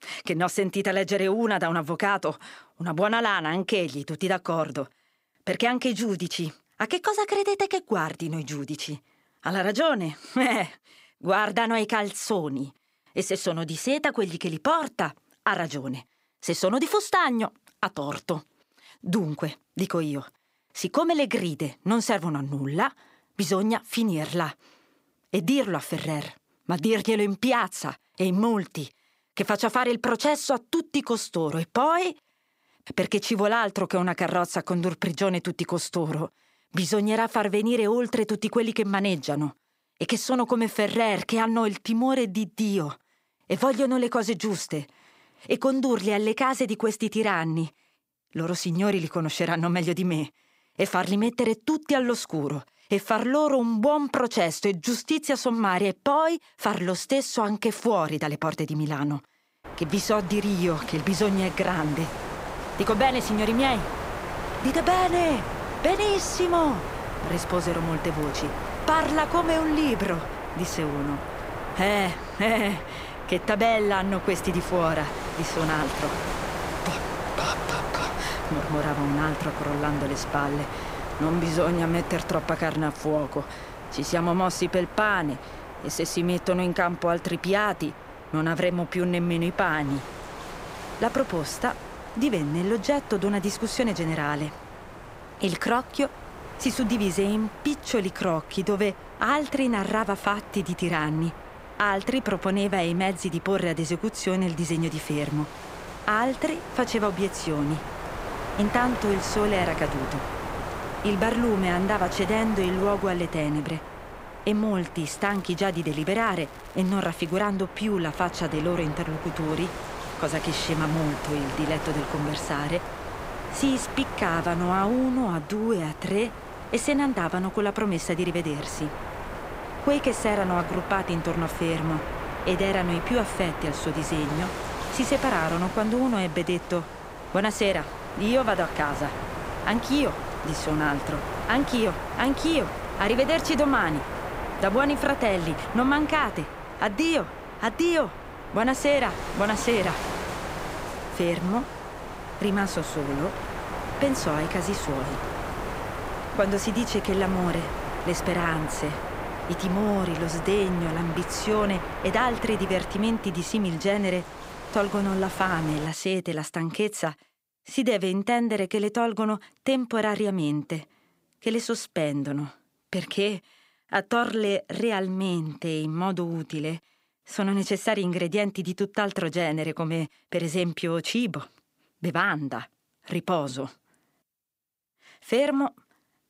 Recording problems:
wind noise on the microphone; heavy; from 1:00 to 2:46; 7 dB below the speech
crackling; faint; from 1:55 to 1:57; 25 dB below the speech

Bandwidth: 15.5 kHz